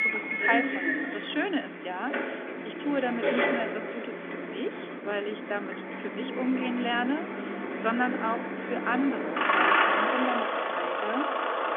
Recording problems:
phone-call audio; nothing above 3.5 kHz
traffic noise; very loud; throughout; 3 dB above the speech

